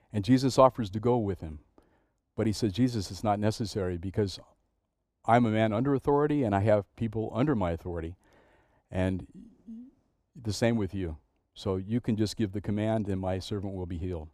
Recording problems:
muffled; slightly; fading above 1.5 kHz

